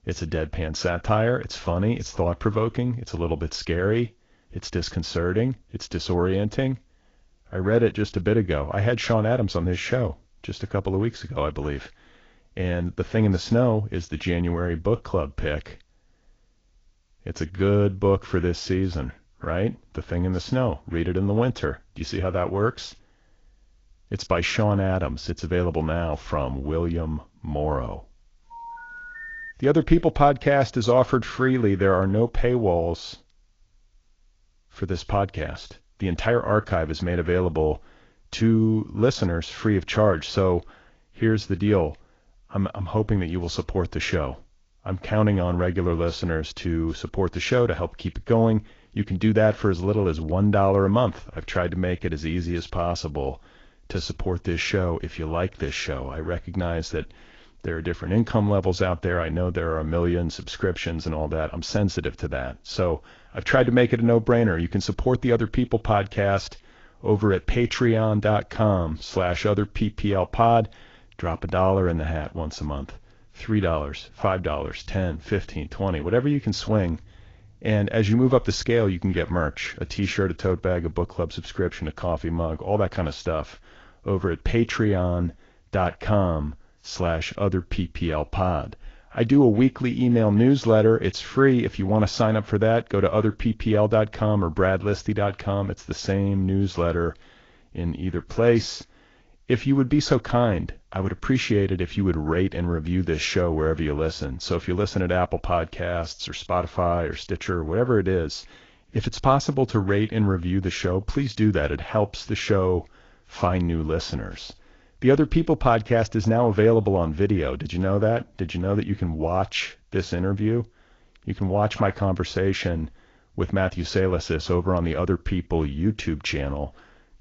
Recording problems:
garbled, watery; slightly; nothing above 6.5 kHz
phone ringing; faint; from 29 to 30 s; peak 10 dB below the speech

